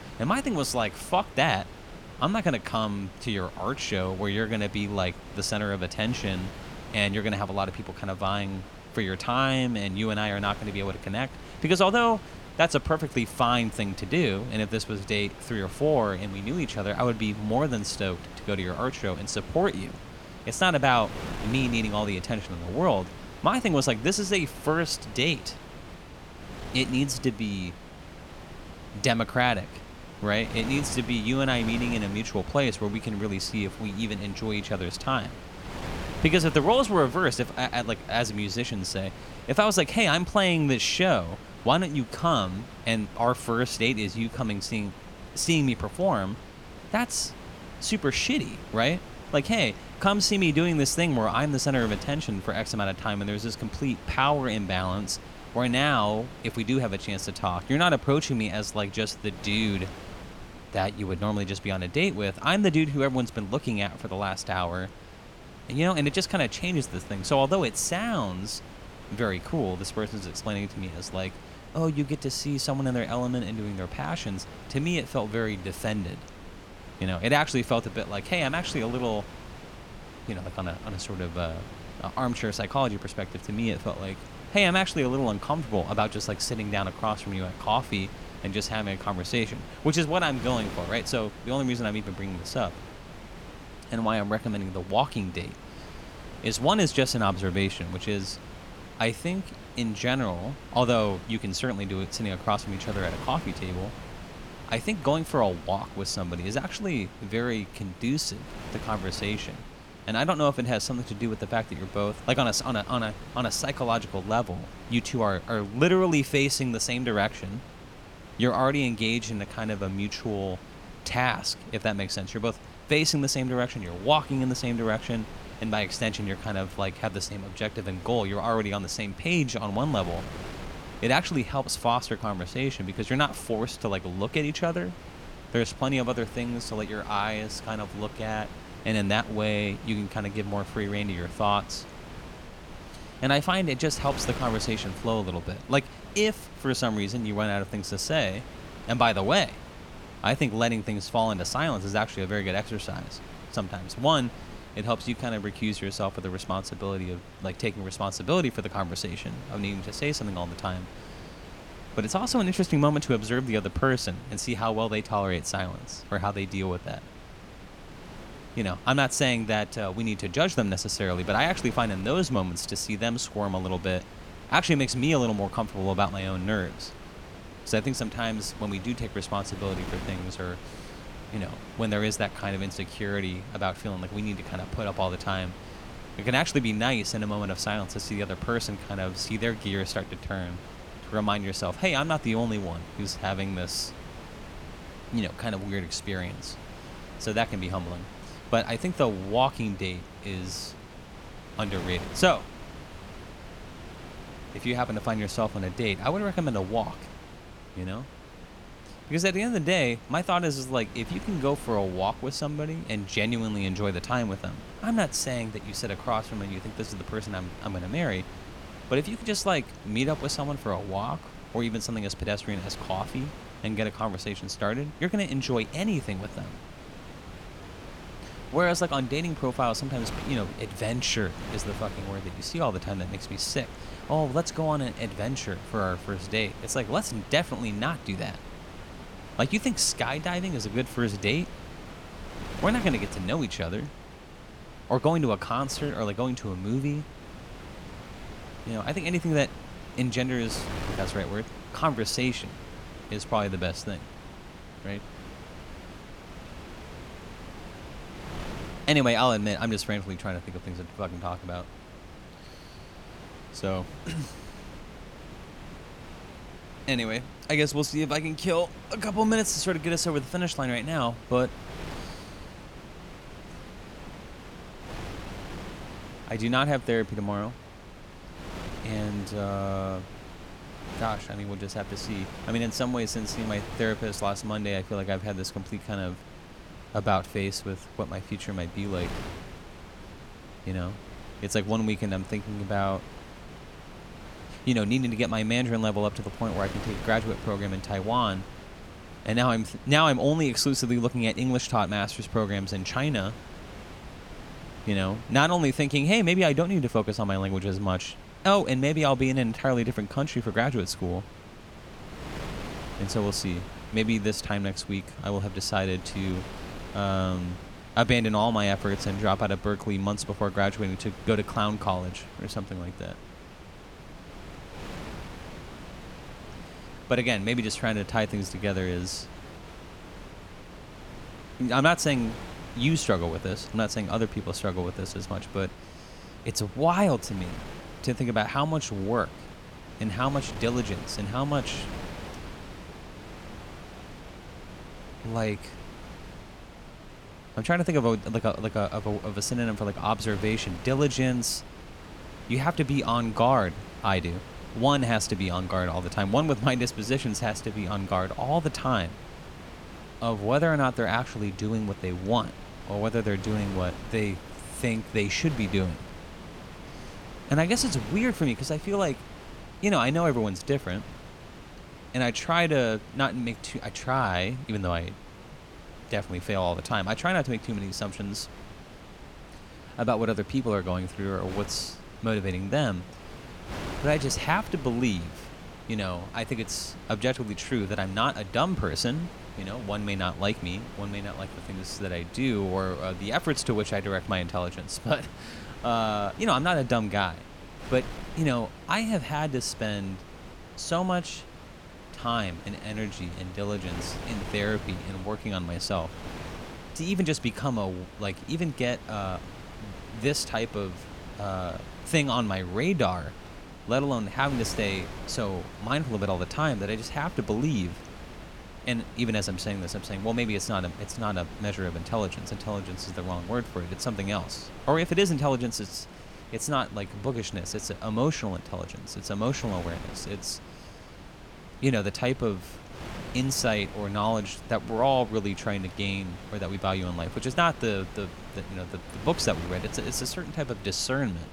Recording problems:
wind noise on the microphone; occasional gusts; 15 dB below the speech

